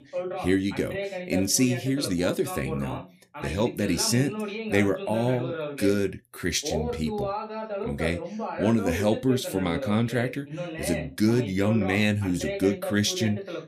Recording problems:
voice in the background; loud; throughout; 8 dB below the speech

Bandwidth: 14.5 kHz